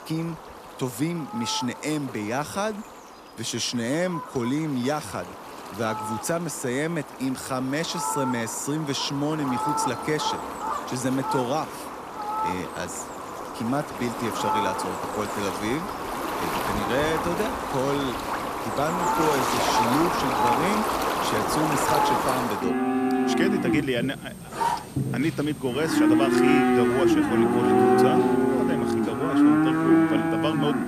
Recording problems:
animal sounds; very loud; throughout; 4 dB above the speech

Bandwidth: 14.5 kHz